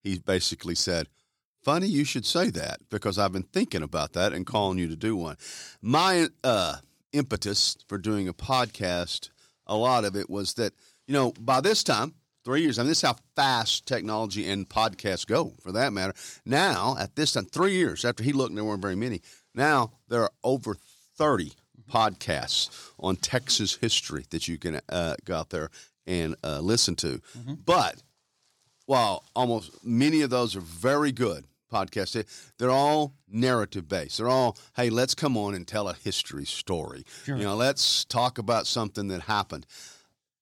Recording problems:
none

